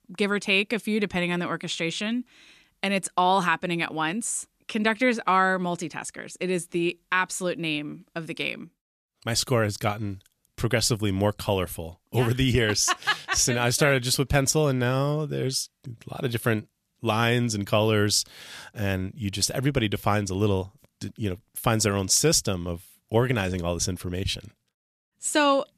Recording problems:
none

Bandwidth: 14.5 kHz